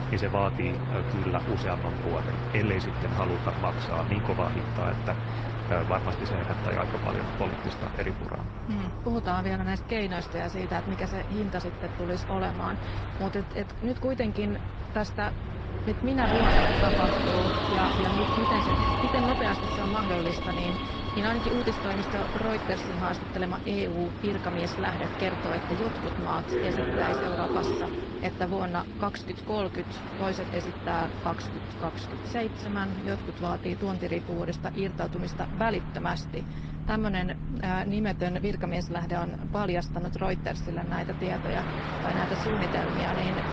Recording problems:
garbled, watery; slightly; nothing above 8 kHz
train or aircraft noise; loud; throughout; as loud as the speech

